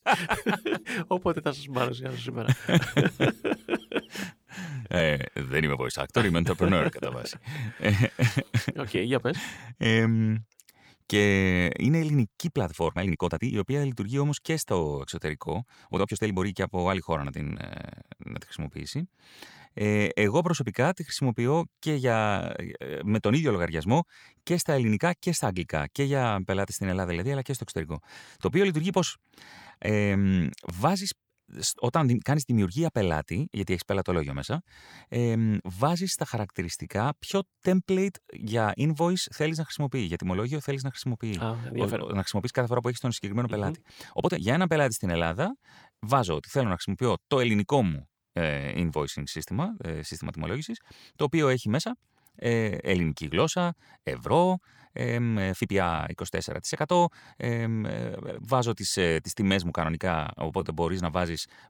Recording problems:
uneven, jittery; strongly; from 4.5 s to 1:01

